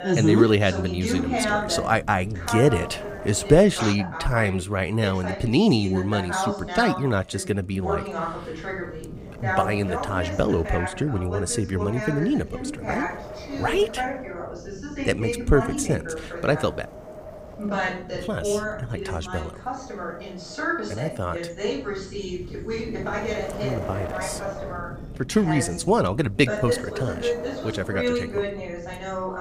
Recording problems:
voice in the background; loud; throughout; 6 dB below the speech
wind noise on the microphone; occasional gusts; 15 dB below the speech

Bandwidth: 15.5 kHz